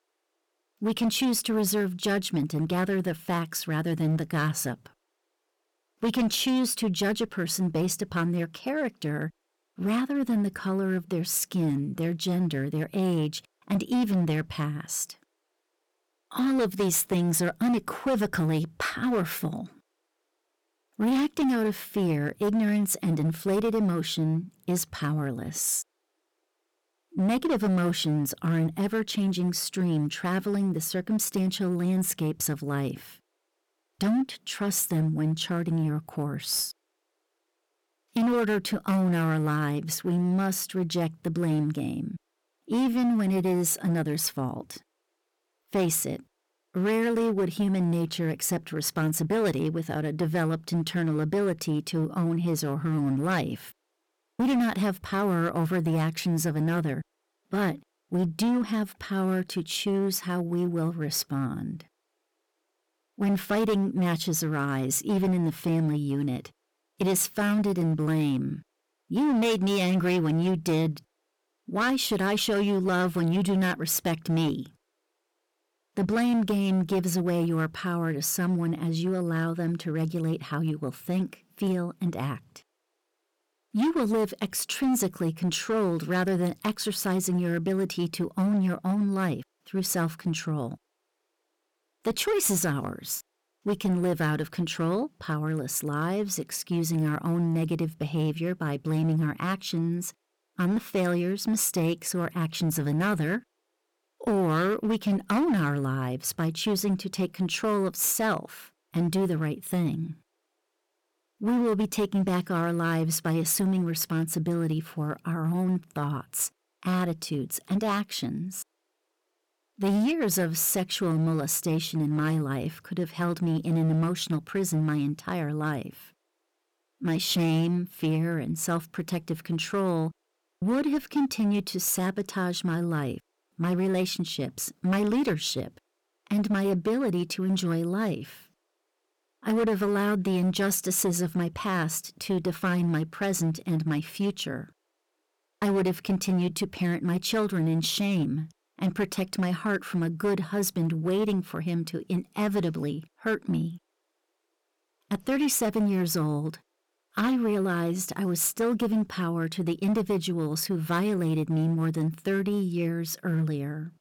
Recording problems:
distortion; slight; 10% of the sound clipped

